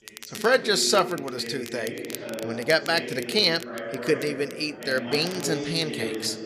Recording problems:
background chatter; loud; throughout; 4 voices, 9 dB below the speech
crackle, like an old record; noticeable; 20 dB below the speech

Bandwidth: 14.5 kHz